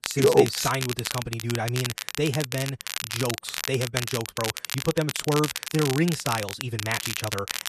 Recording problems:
wrong speed, natural pitch; too fast; 1.5 times normal speed
crackle, like an old record; loud; 4 dB below the speech

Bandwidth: 13.5 kHz